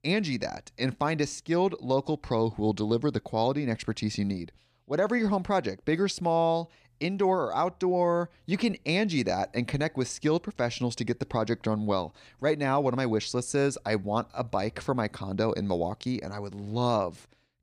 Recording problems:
none

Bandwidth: 14.5 kHz